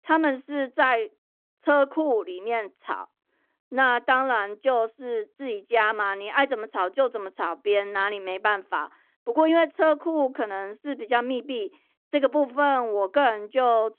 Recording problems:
phone-call audio

